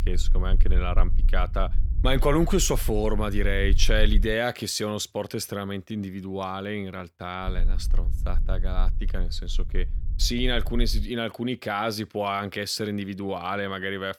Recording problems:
low rumble; faint; until 4.5 s and from 7.5 to 11 s; 20 dB below the speech

